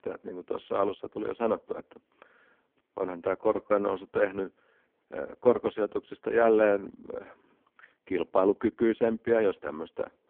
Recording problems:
phone-call audio; poor line

